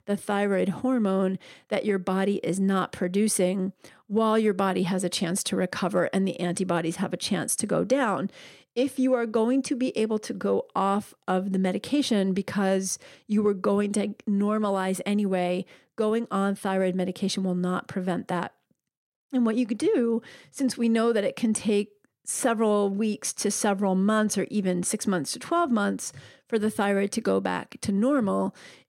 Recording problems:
none

